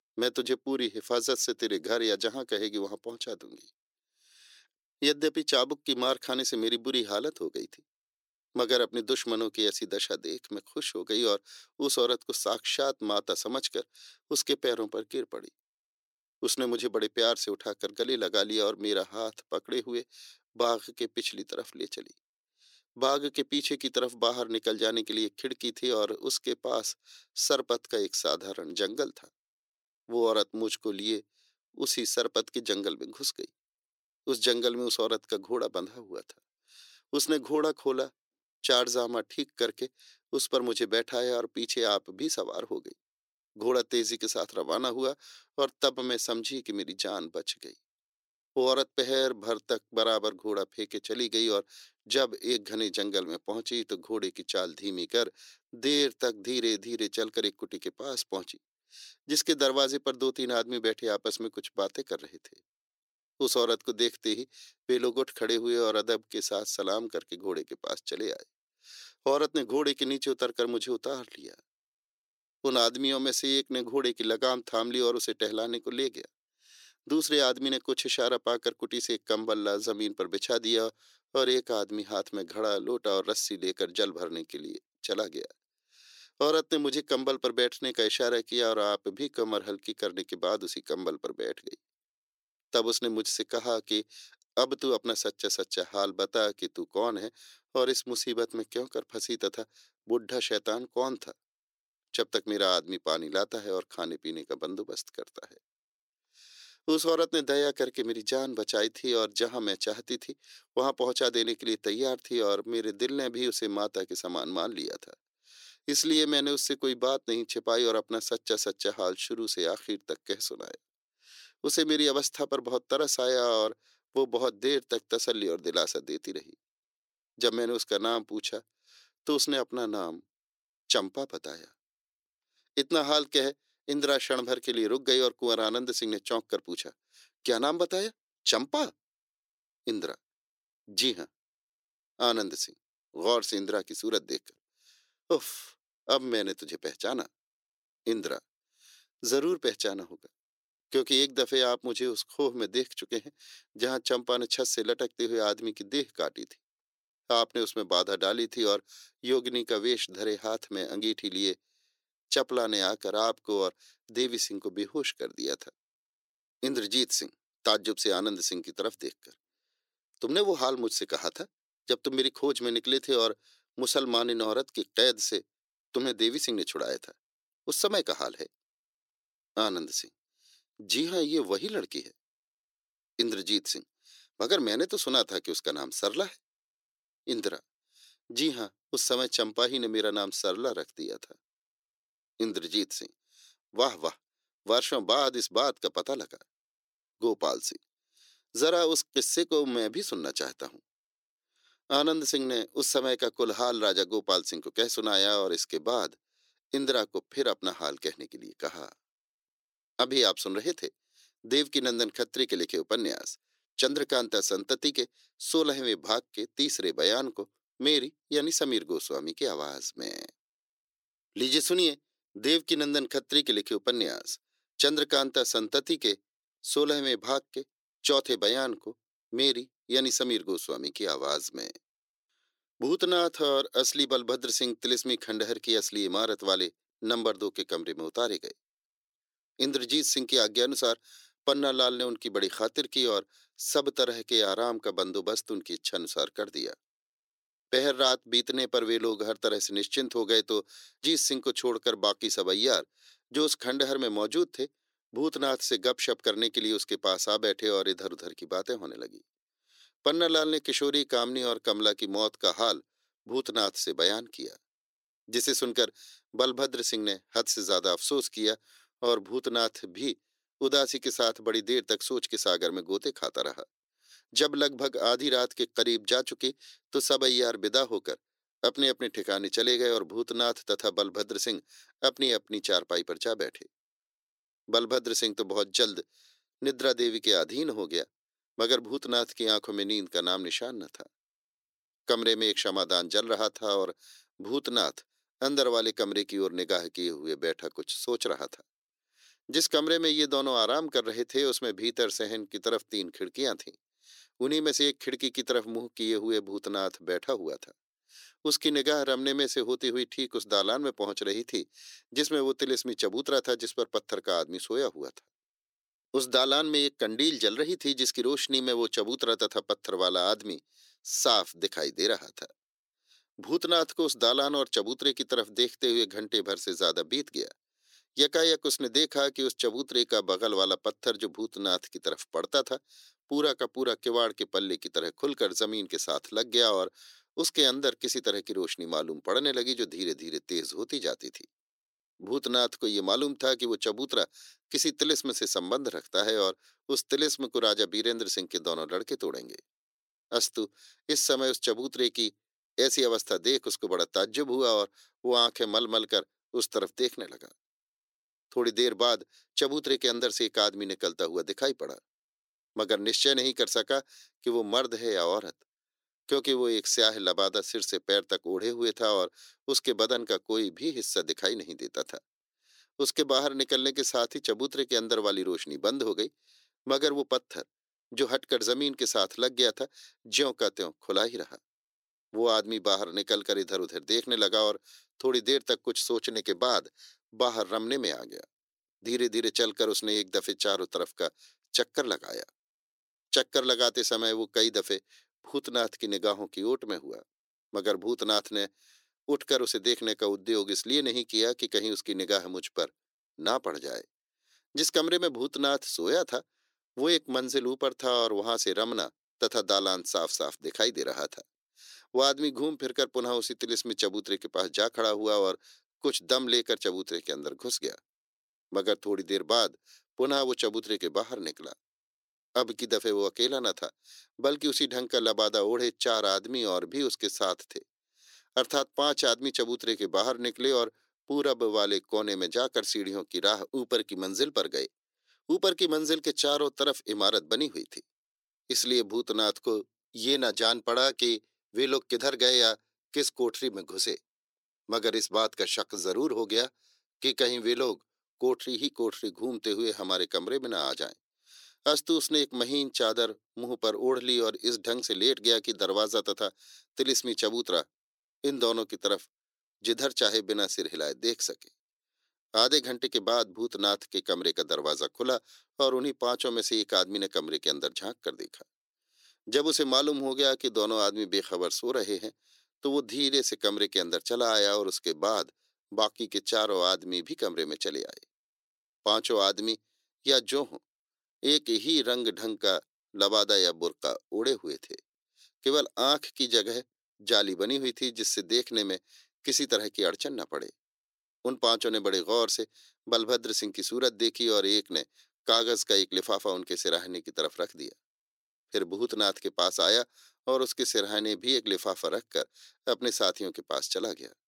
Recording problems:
thin; somewhat; fading below 350 Hz

